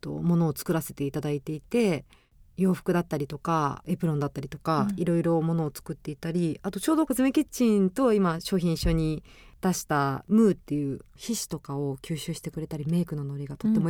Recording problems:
abrupt cut into speech; at the end

